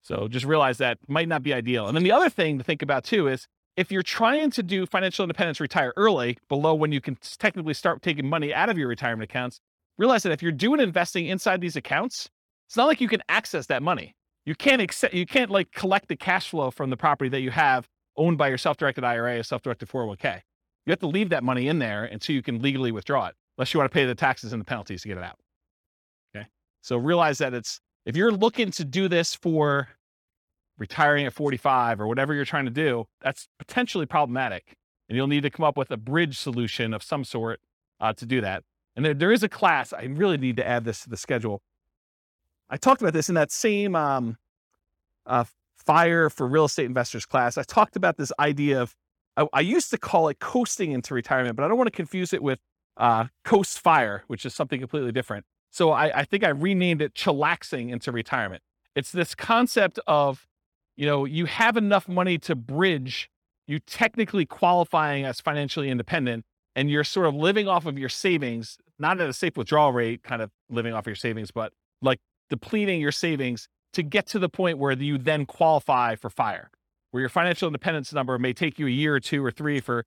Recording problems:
none

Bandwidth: 18 kHz